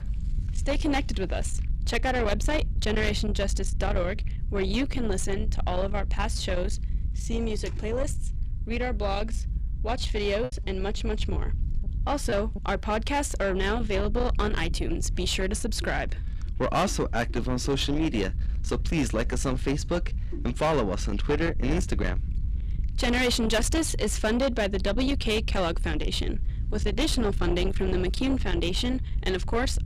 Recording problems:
distortion; slight; 10 dB below the speech
low rumble; noticeable; throughout; 15 dB below the speech
choppy; very; from 10 to 12 s; 7% of the speech affected

